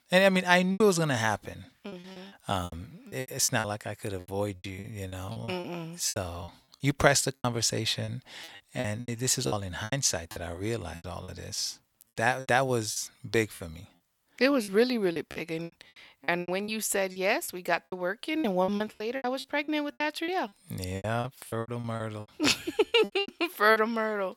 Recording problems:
choppy; very; 15% of the speech affected

